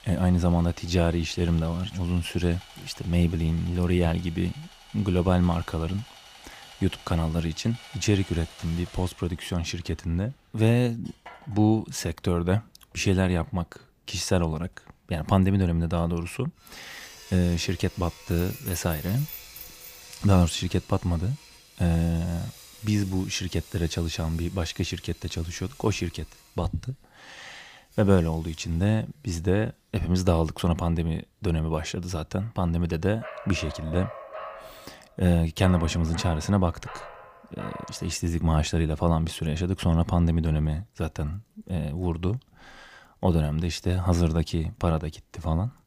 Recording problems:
machinery noise; faint; throughout; 20 dB below the speech
jangling keys; noticeable; from 18 to 20 s; peak 10 dB below the speech
dog barking; faint; from 33 to 38 s; peak 10 dB below the speech

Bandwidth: 15 kHz